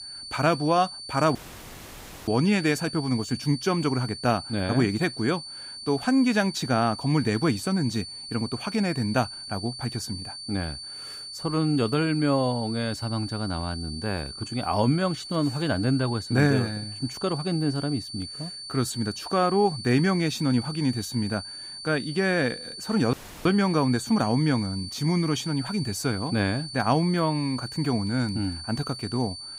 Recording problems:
high-pitched whine; loud; throughout; 4.5 kHz, 10 dB below the speech
audio cutting out; at 1.5 s for 1 s and at 23 s

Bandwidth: 15.5 kHz